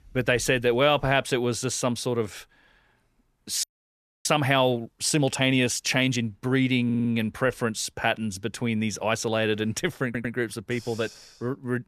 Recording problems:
audio freezing; at 3.5 s for 0.5 s
audio stuttering; at 7 s and at 10 s

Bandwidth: 14 kHz